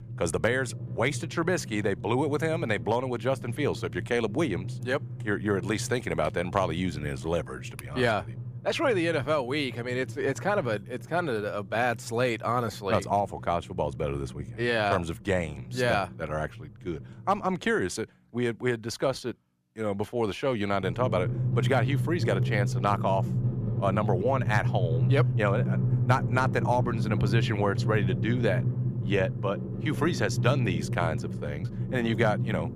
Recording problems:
background music; loud; throughout; 3 dB below the speech

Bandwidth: 15 kHz